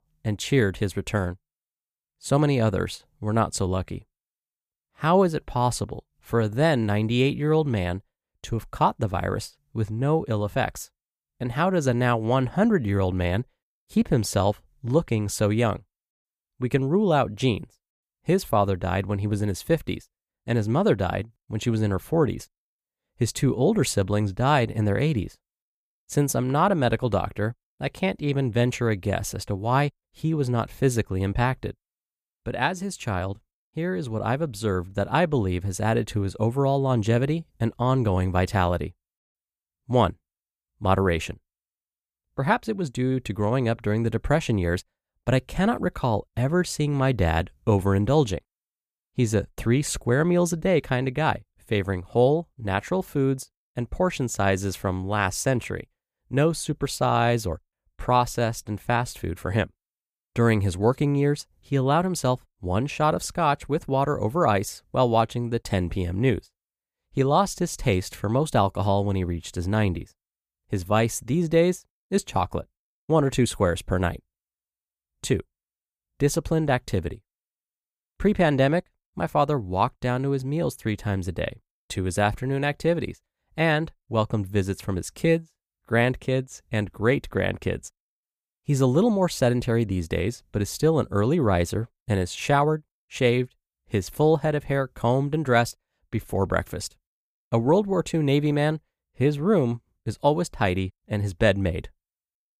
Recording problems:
none

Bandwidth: 15 kHz